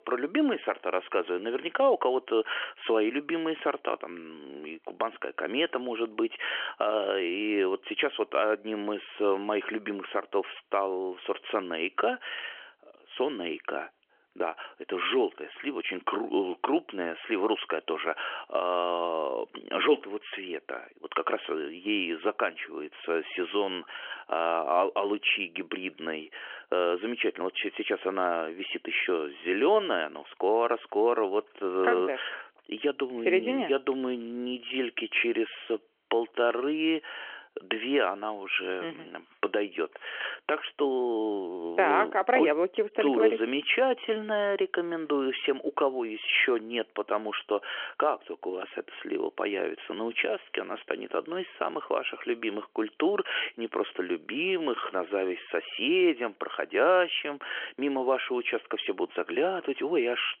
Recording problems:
phone-call audio; nothing above 3 kHz

